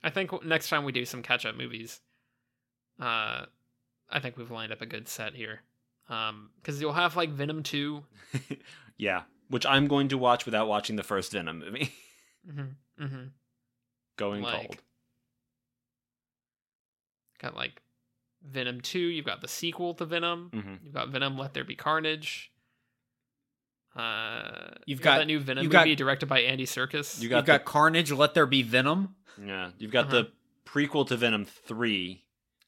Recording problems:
none

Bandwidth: 16.5 kHz